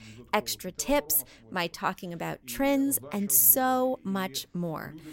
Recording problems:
voice in the background; faint; throughout; 25 dB below the speech

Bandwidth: 16 kHz